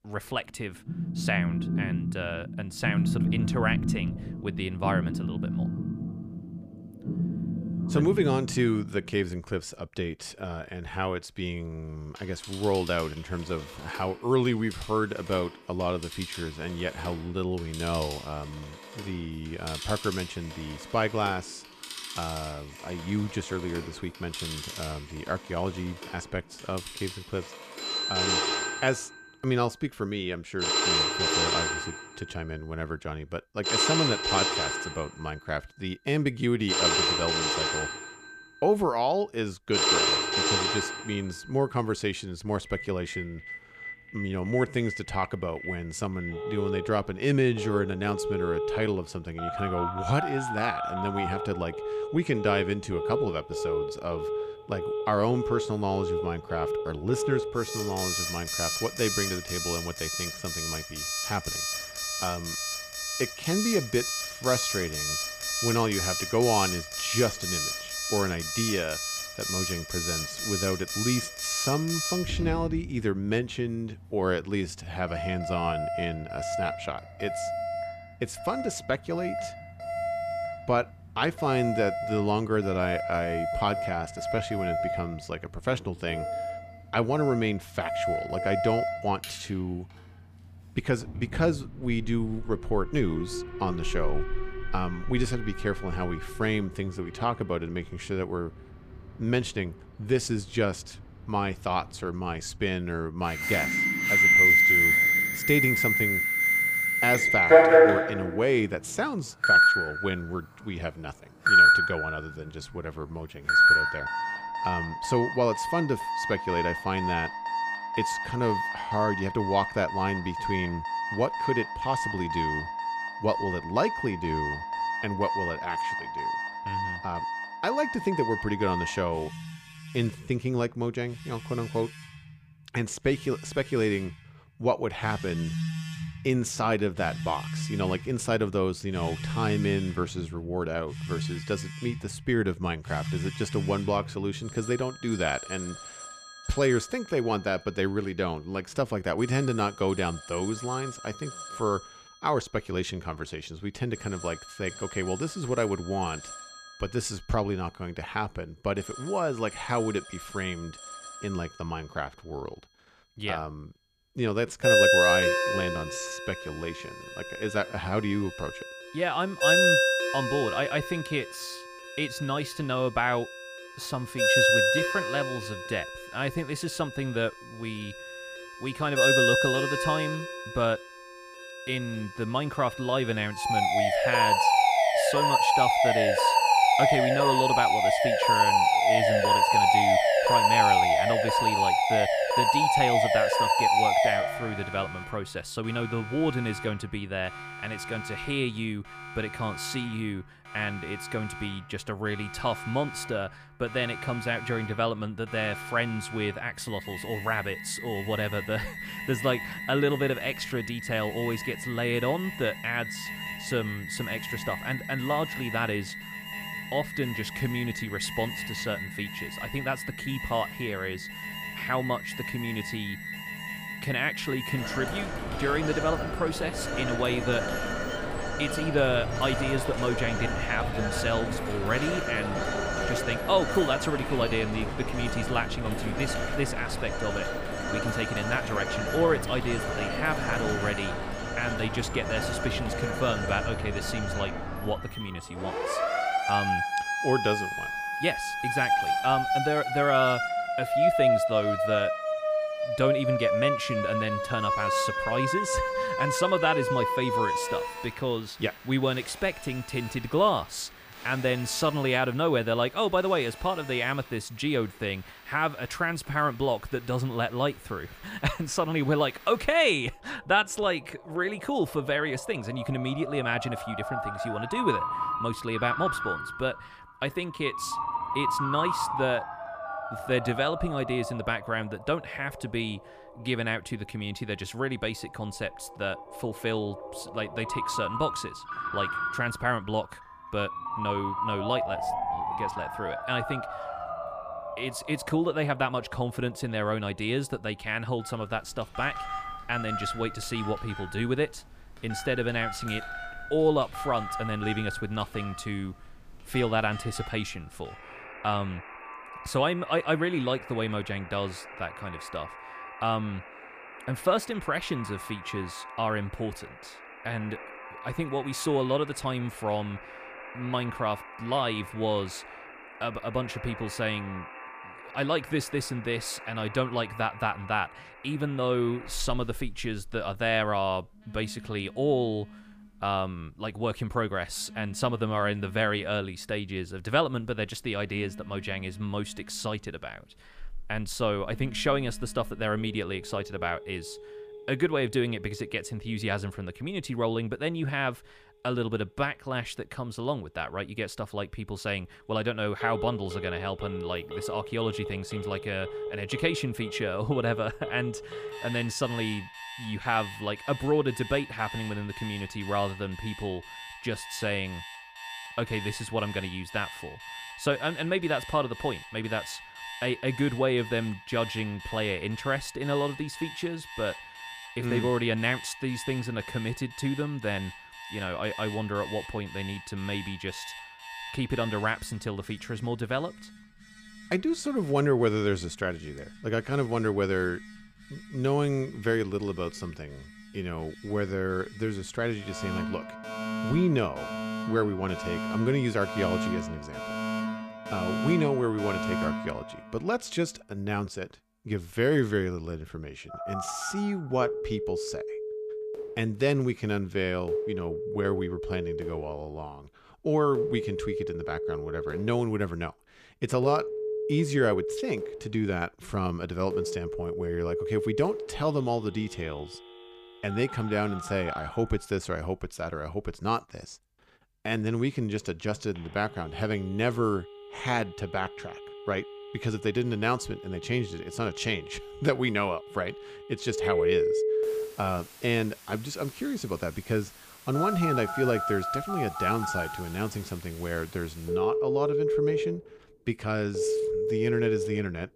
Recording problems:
alarms or sirens; very loud; throughout; 2 dB above the speech

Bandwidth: 15 kHz